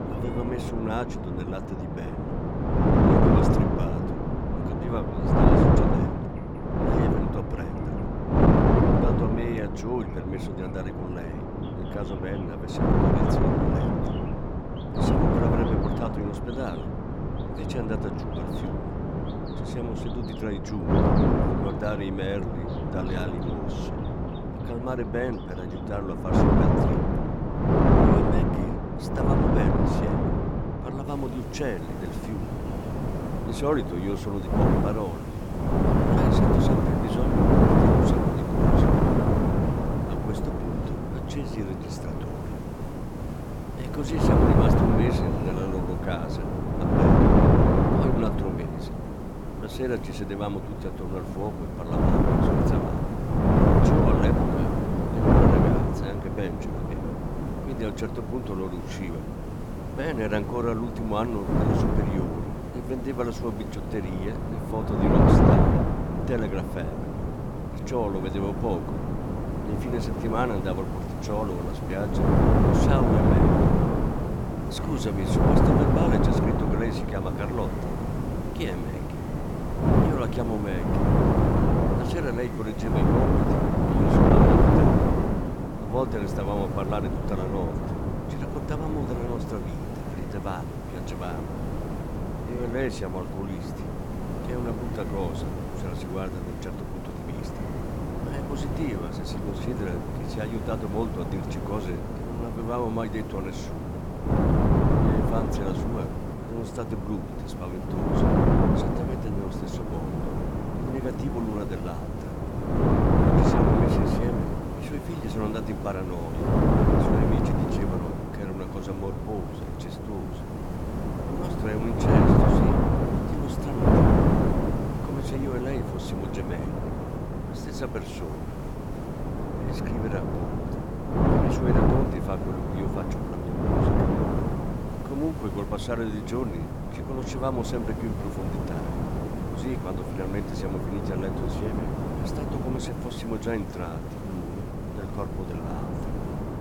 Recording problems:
wind noise on the microphone; heavy; 5 dB above the speech
hiss; noticeable; from 31 s on; 15 dB below the speech
animal sounds; faint; throughout; 25 dB below the speech

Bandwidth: 17 kHz